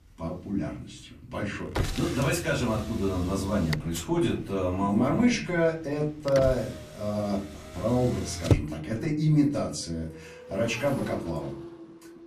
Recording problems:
off-mic speech; far
room echo; slight; dies away in 0.4 s
traffic noise; loud; throughout; 8 dB below the speech

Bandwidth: 14.5 kHz